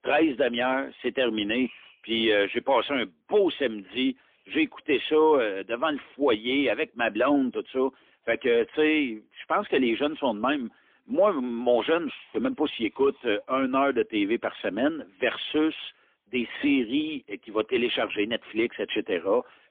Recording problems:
phone-call audio; poor line; nothing above 3.5 kHz

